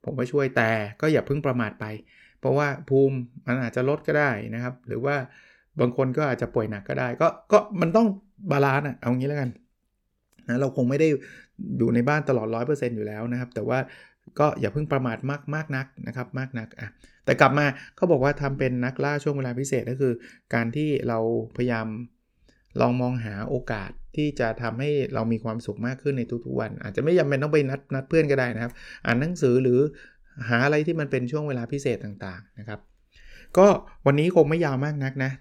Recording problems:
none

